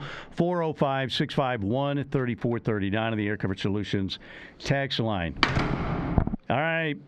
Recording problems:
squashed, flat; heavily
muffled; very slightly; fading above 3 kHz
door banging; loud; at 5.5 s; peak 3 dB above the speech

